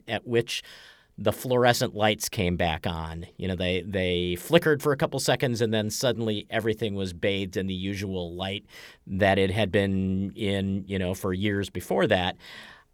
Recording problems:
none

